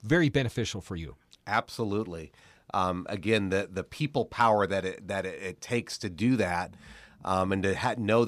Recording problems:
abrupt cut into speech; at the end

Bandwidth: 14.5 kHz